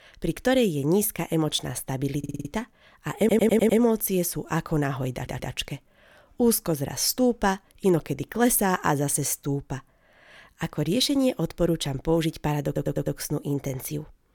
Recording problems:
audio stuttering; 4 times, first at 2 s

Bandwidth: 18 kHz